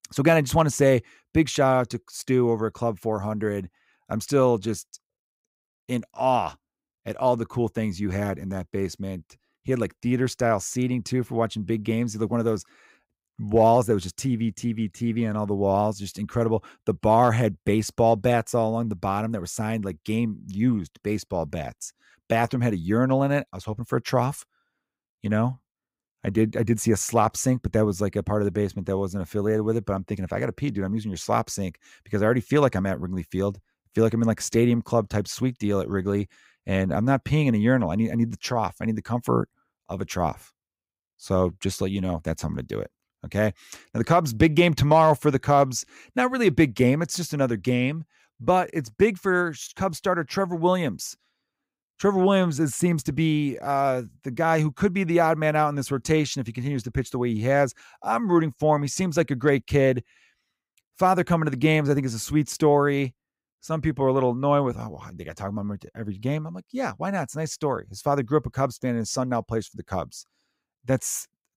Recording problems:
none

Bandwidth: 15.5 kHz